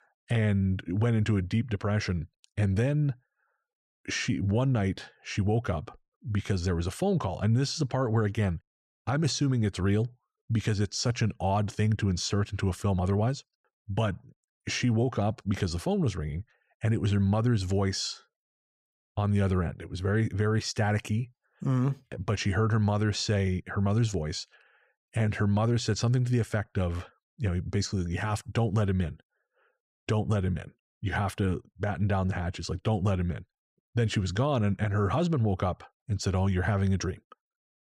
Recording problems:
none

